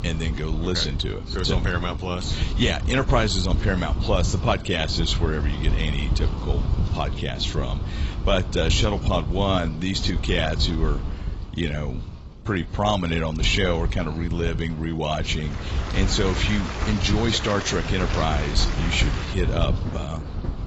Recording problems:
garbled, watery; badly; nothing above 8 kHz
rain or running water; loud; from 16 s on; 8 dB below the speech
wind noise on the microphone; occasional gusts; 15 dB below the speech

